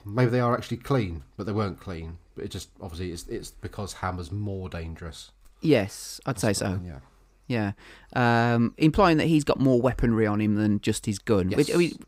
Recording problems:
none

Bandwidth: 15.5 kHz